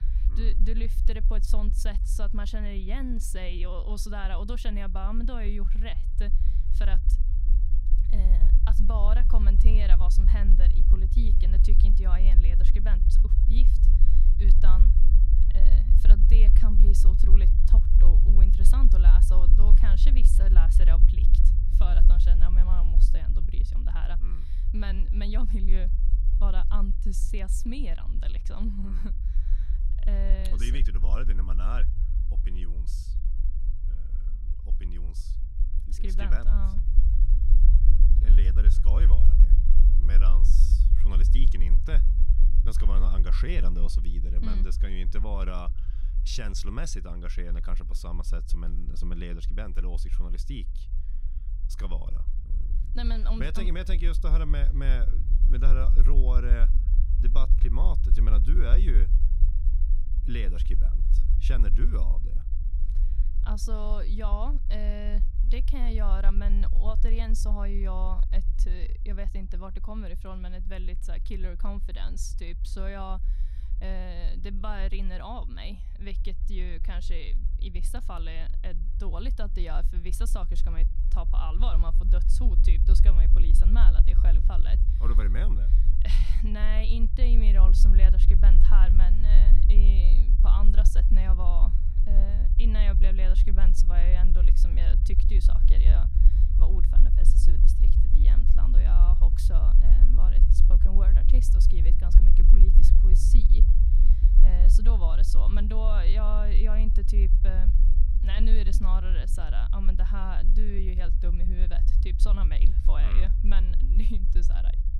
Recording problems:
low rumble; loud; throughout; 7 dB below the speech

